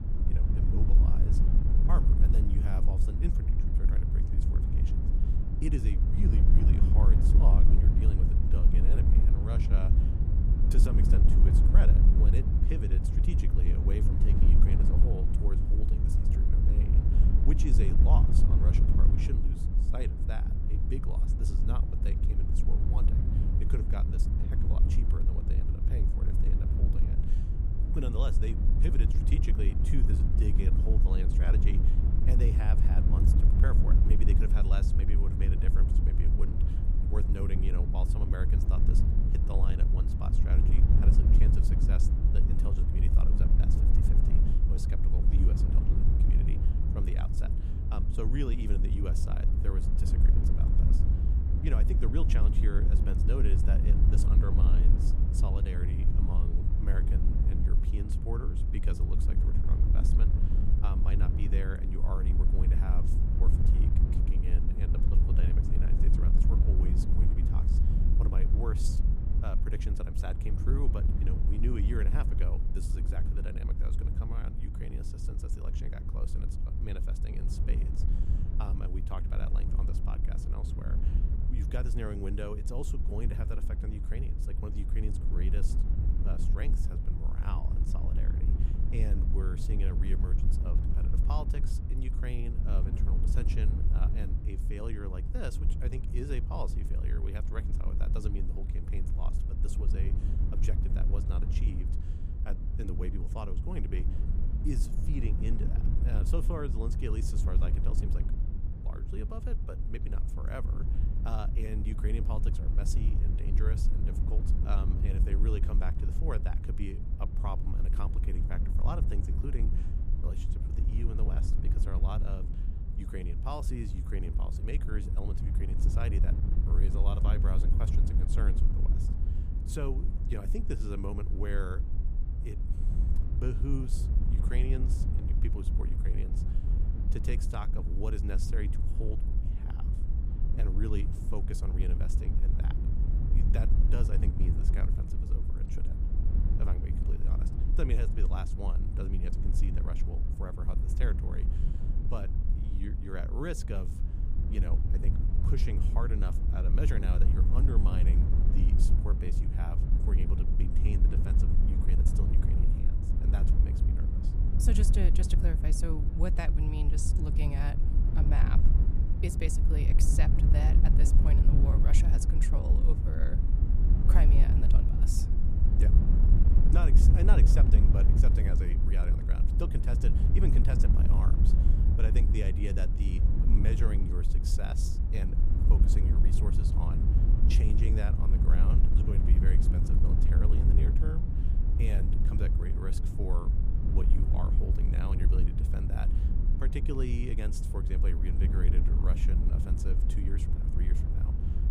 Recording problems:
wind noise on the microphone; heavy; 1 dB below the speech

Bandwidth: 15 kHz